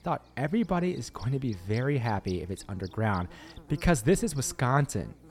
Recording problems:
electrical hum; faint; throughout; 60 Hz, 20 dB below the speech

